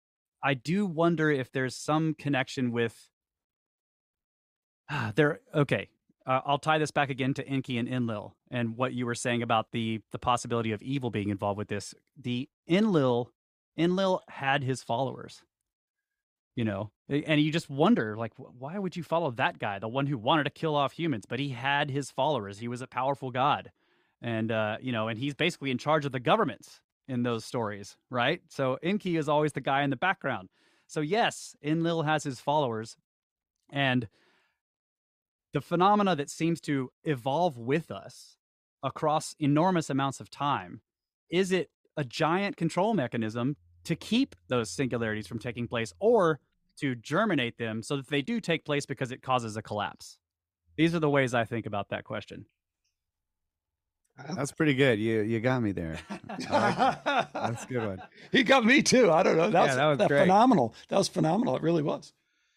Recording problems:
none

